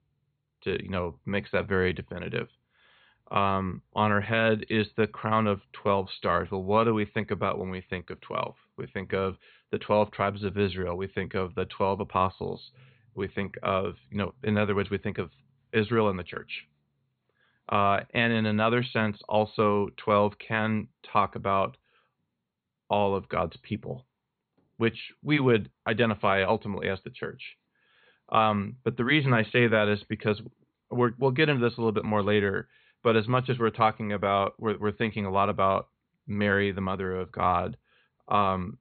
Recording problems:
high frequencies cut off; severe; nothing above 4.5 kHz

